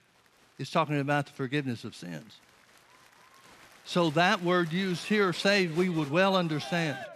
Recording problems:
crowd noise; noticeable; throughout; 20 dB below the speech

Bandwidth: 13.5 kHz